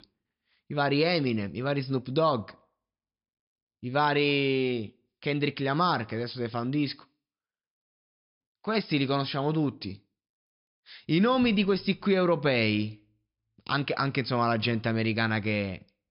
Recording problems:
high frequencies cut off; noticeable; nothing above 5.5 kHz

